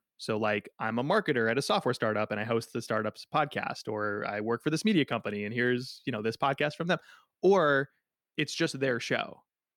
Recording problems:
none

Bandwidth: 18 kHz